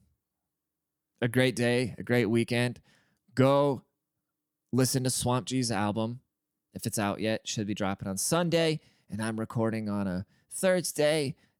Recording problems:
none

